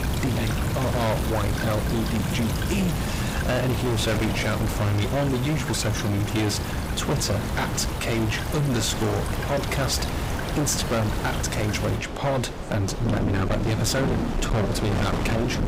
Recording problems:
distortion; heavy; 26% of the sound clipped
wind noise on the microphone; heavy; 9 dB below the speech
rain or running water; loud; throughout; 3 dB below the speech
murmuring crowd; noticeable; throughout; 15 dB below the speech

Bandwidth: 15.5 kHz